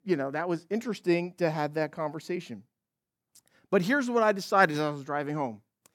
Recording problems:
none

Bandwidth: 17 kHz